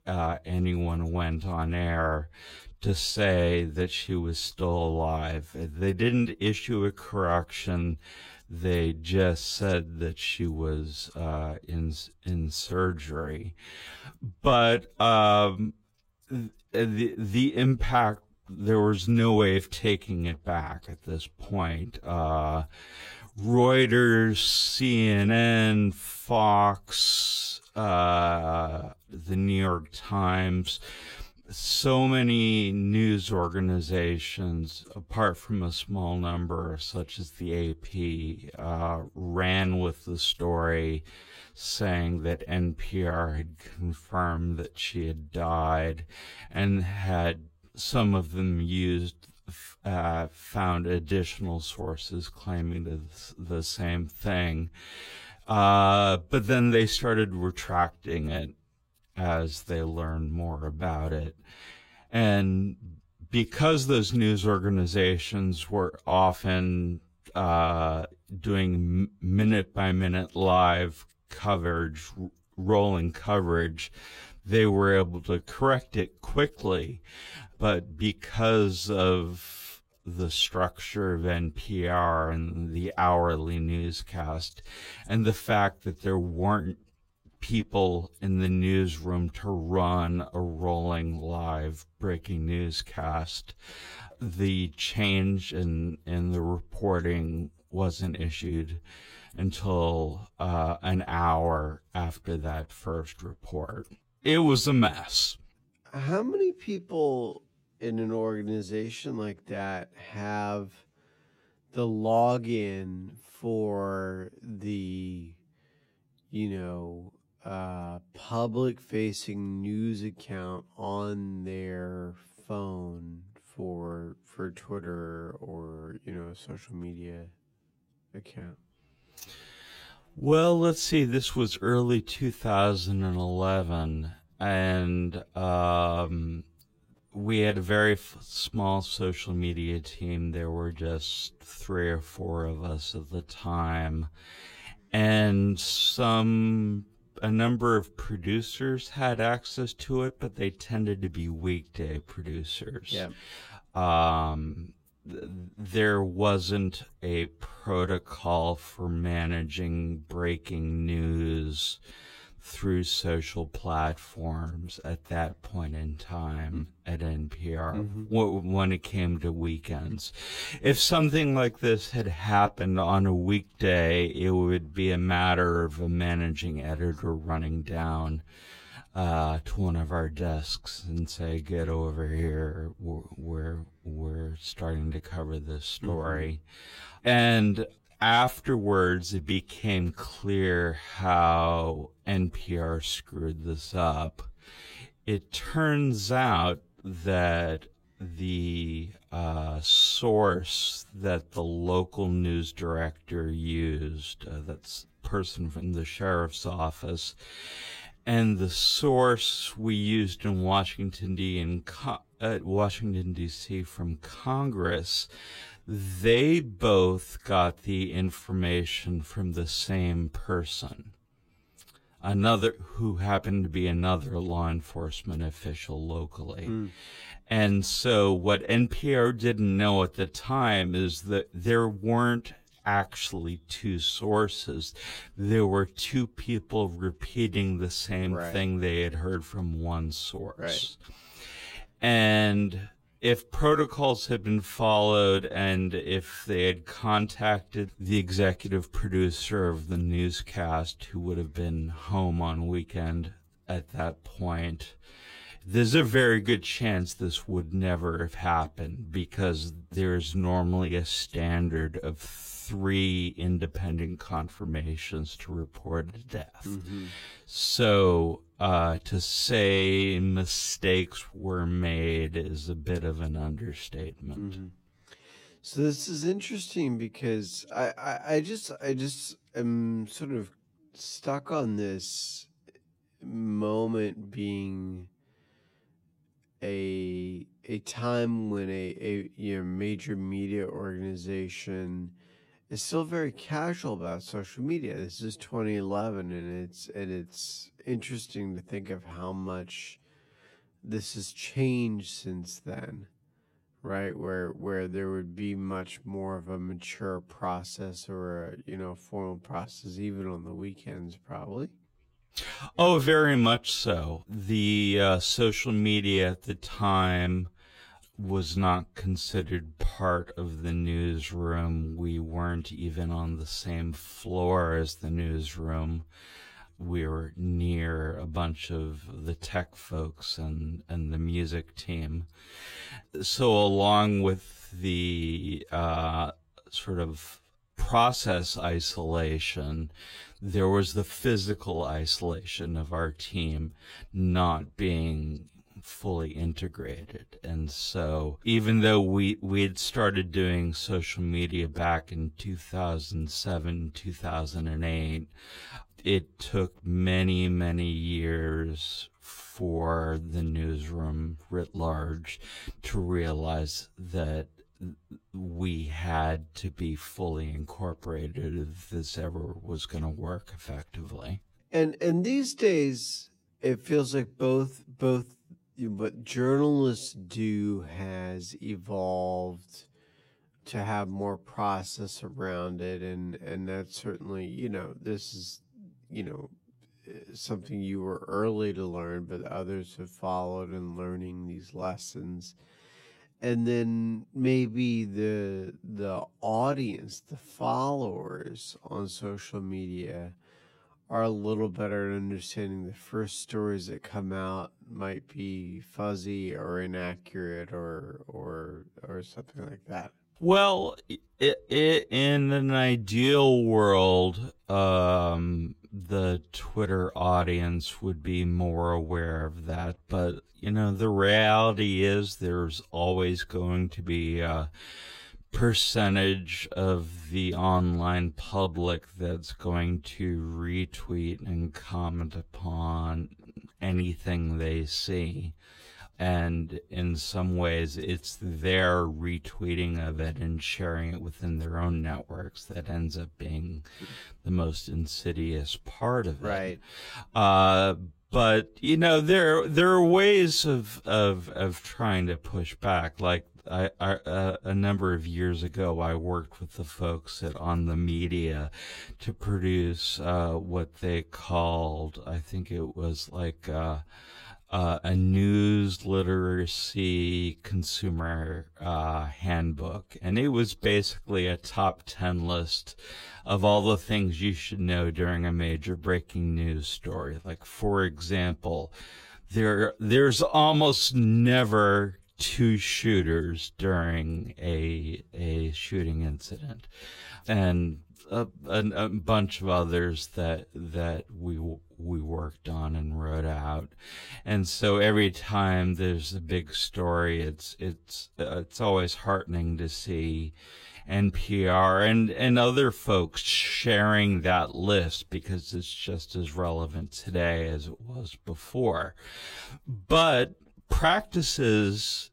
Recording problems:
wrong speed, natural pitch; too slow; 0.6 times normal speed

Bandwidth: 16 kHz